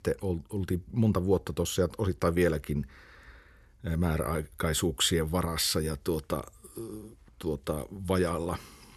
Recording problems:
none

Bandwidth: 13.5 kHz